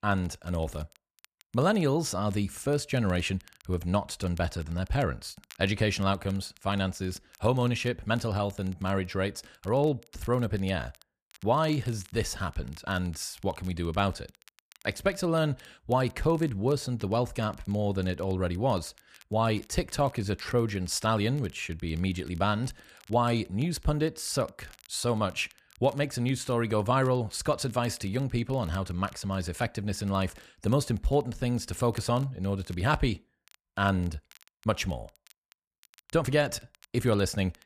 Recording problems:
crackle, like an old record; faint; 25 dB below the speech

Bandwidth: 14.5 kHz